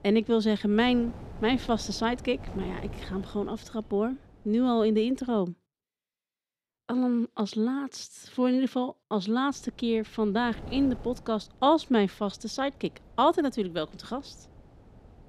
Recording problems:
wind noise on the microphone; occasional gusts; until 5.5 s and from 9.5 s on; 20 dB below the speech

